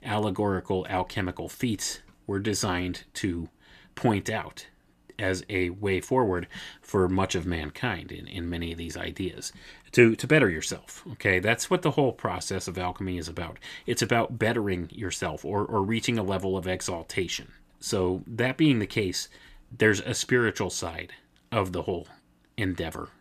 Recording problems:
none

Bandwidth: 14.5 kHz